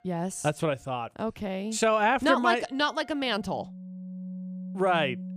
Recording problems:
background music; noticeable; throughout; 15 dB below the speech

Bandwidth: 14.5 kHz